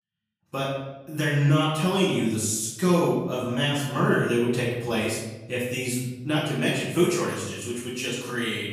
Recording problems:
off-mic speech; far
room echo; noticeable; dies away in 0.9 s

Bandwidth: 15 kHz